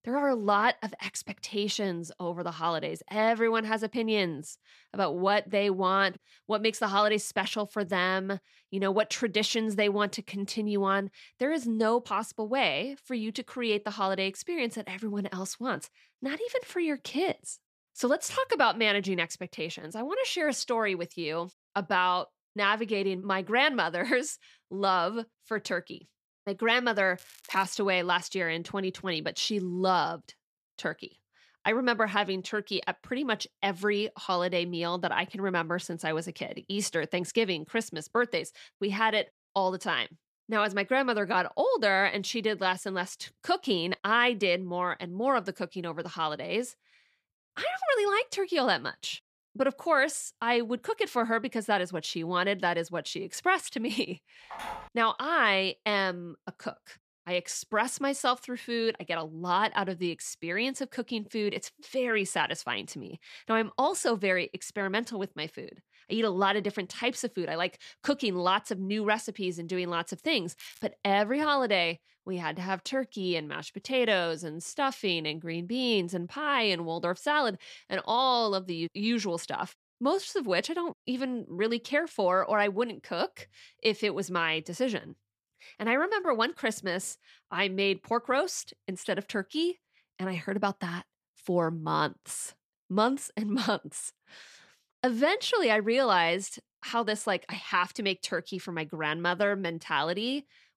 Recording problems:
crackling; faint; at 27 s and at 1:11; 25 dB below the speech
phone ringing; faint; at 55 s; peak 10 dB below the speech

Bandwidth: 14.5 kHz